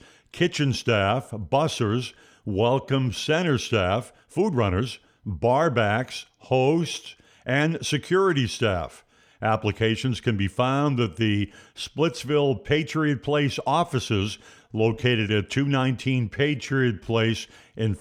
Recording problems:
uneven, jittery; strongly; from 1 to 17 s

